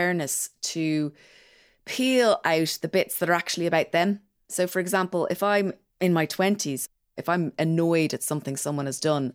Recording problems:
abrupt cut into speech; at the start

